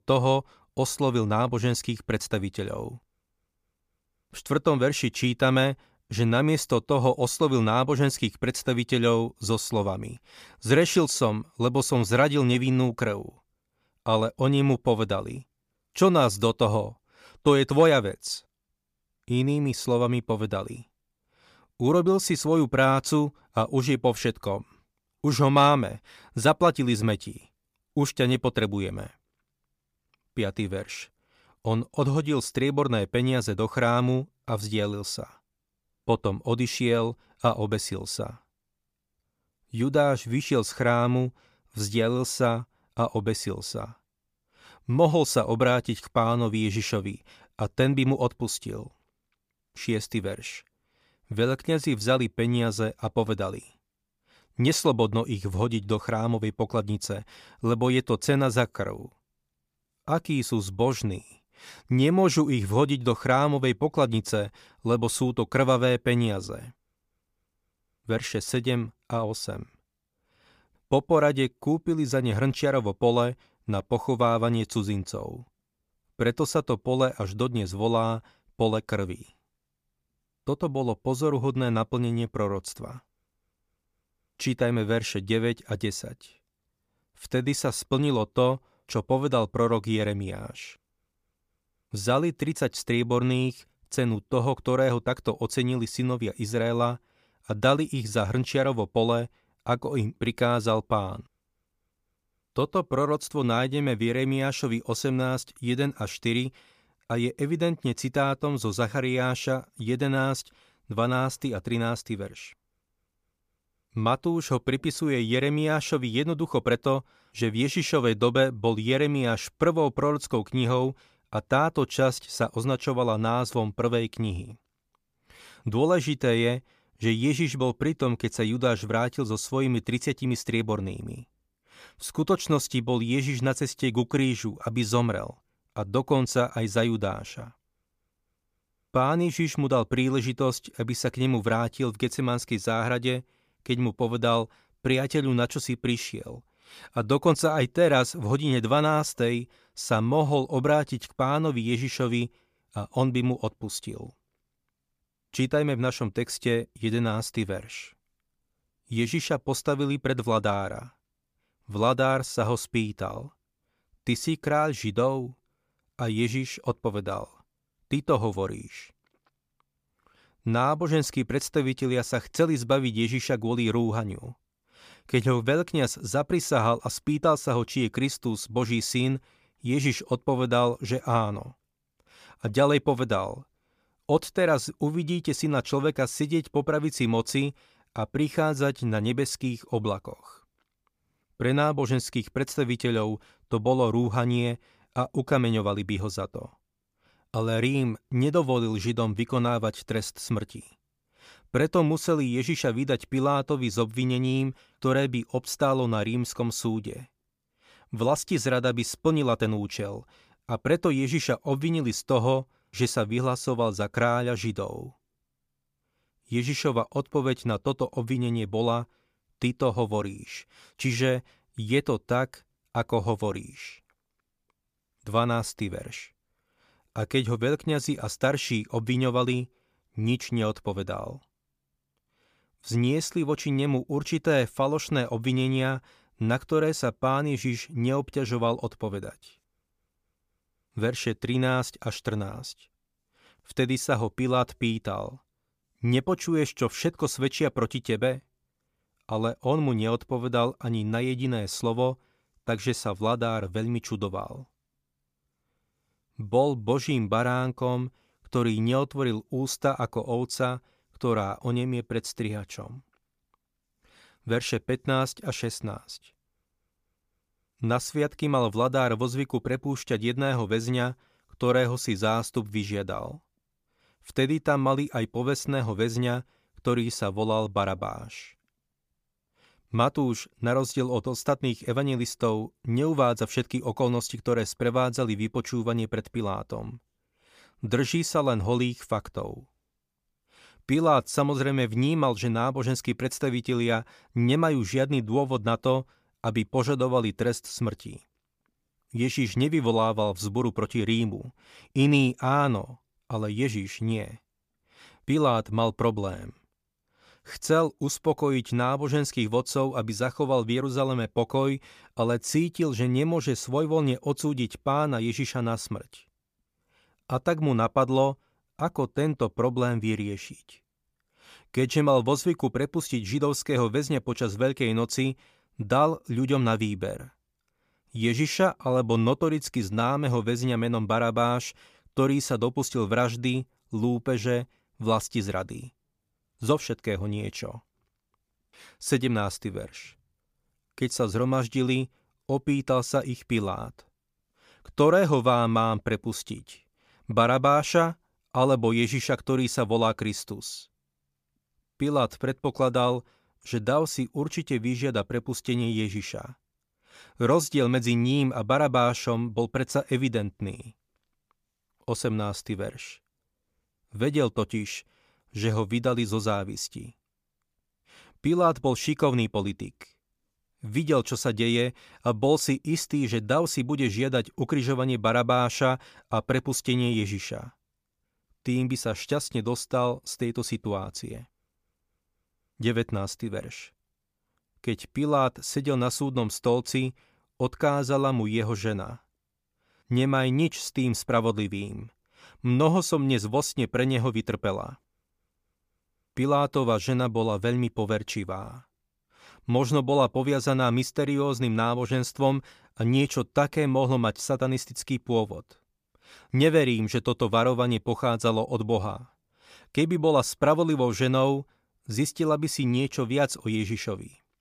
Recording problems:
none

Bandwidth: 15 kHz